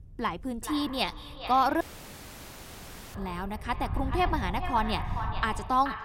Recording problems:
echo of what is said; strong; throughout; 430 ms later, 10 dB below the speech
wind noise on the microphone; occasional gusts; 25 dB below the speech
audio cutting out; at 2 s for 1.5 s

